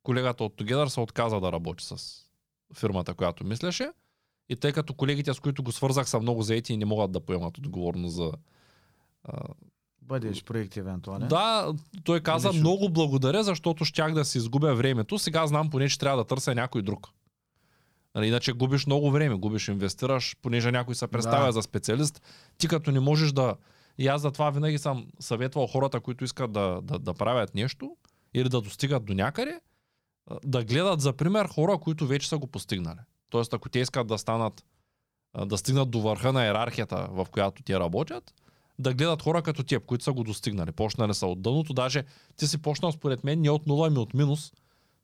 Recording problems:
none

